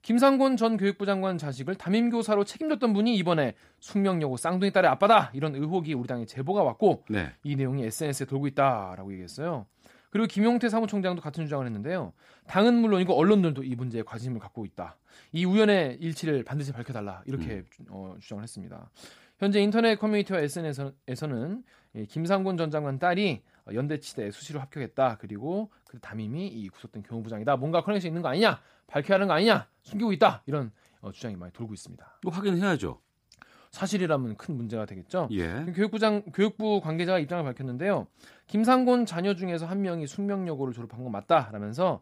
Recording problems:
none

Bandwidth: 15 kHz